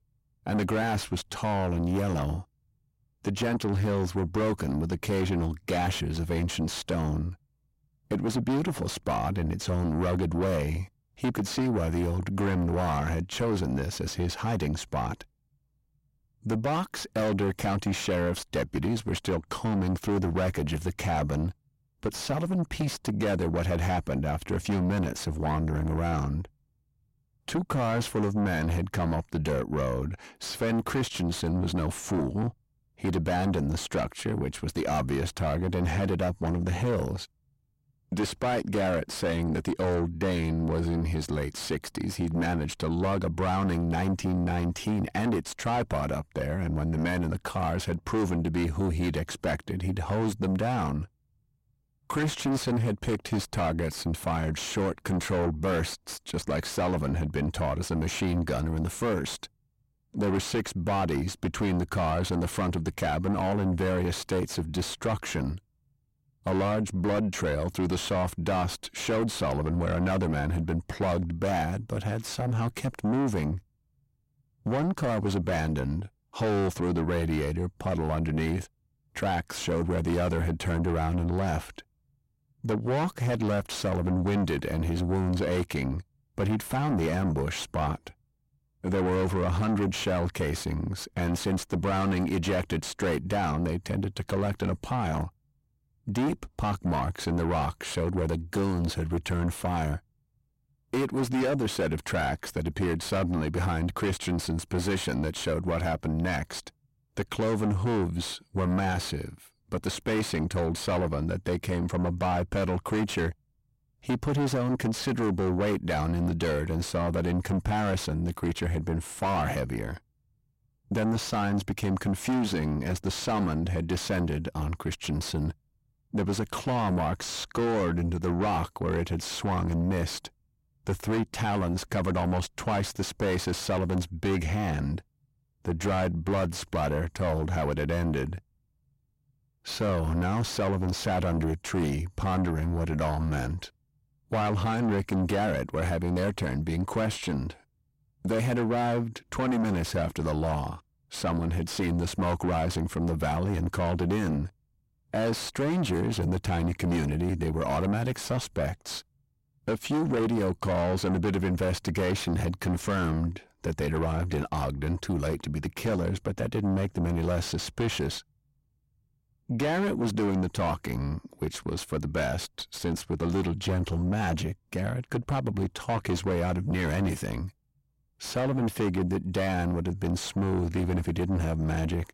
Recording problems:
distortion; heavy; 6 dB below the speech

